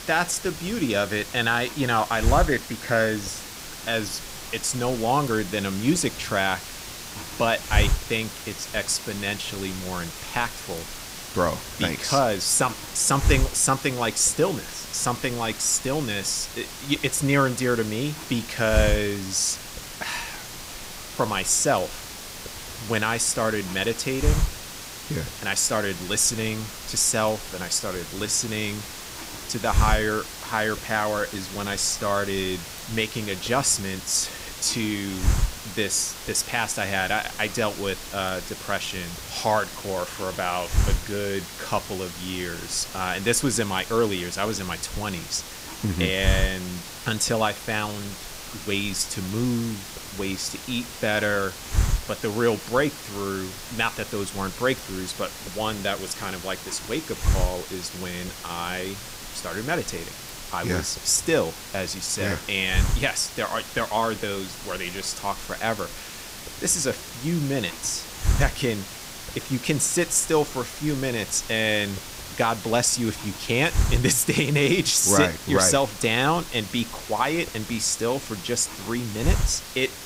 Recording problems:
hiss; loud; throughout; 8 dB below the speech

